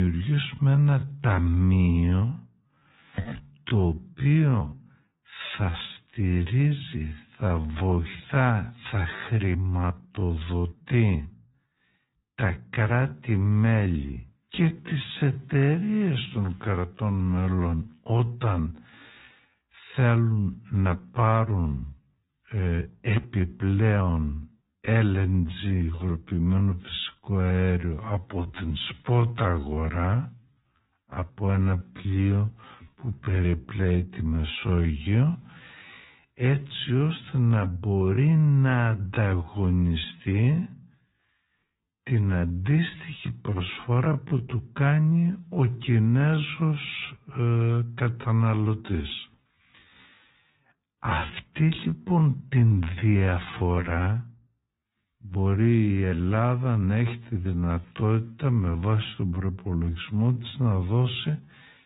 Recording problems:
high frequencies cut off; severe; nothing above 4 kHz
wrong speed, natural pitch; too slow; 0.5 times normal speed
garbled, watery; slightly
abrupt cut into speech; at the start

